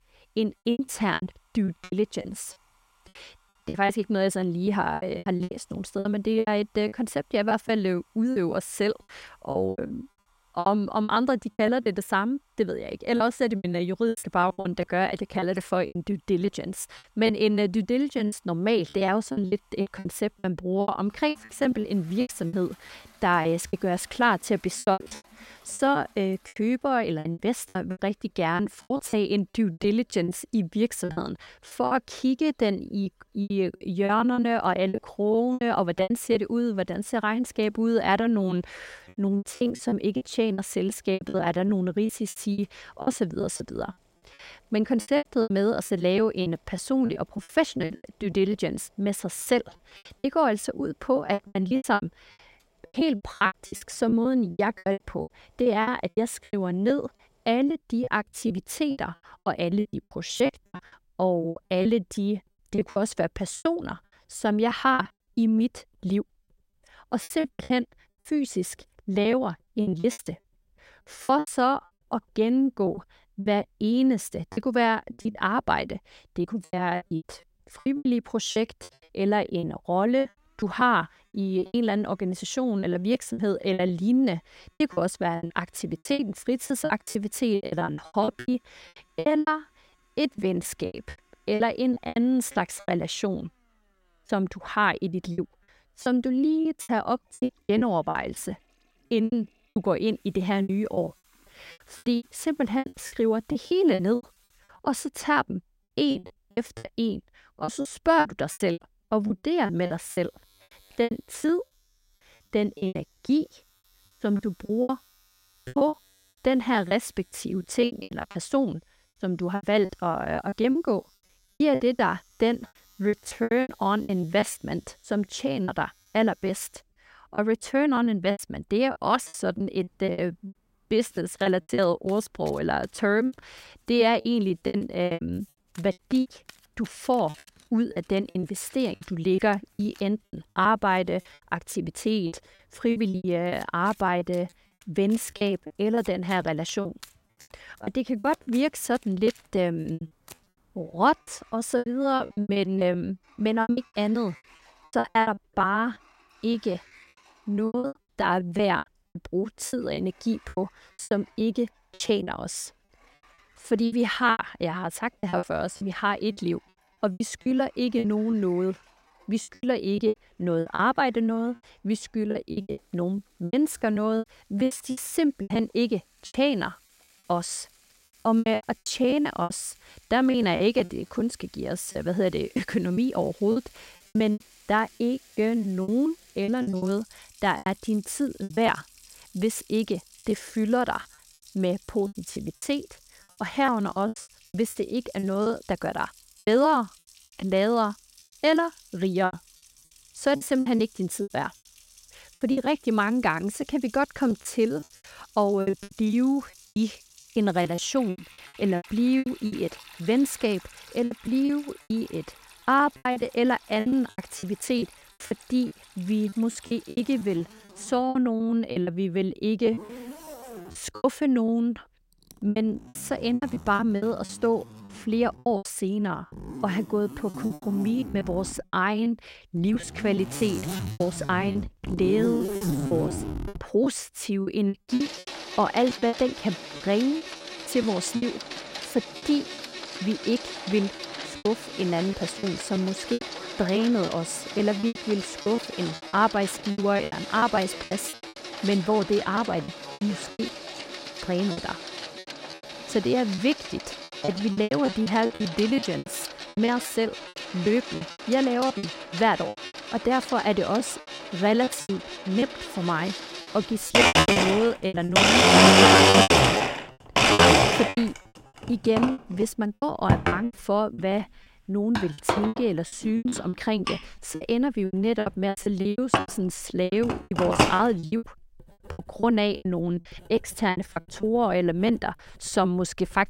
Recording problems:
household noises; very loud; throughout; as loud as the speech
choppy; very; 15% of the speech affected

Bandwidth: 16 kHz